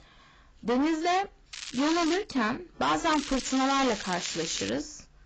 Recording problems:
distortion; heavy; 15% of the sound clipped
garbled, watery; badly; nothing above 7.5 kHz
crackling; loud; at 1.5 s and from 3 to 4.5 s; 10 dB below the speech

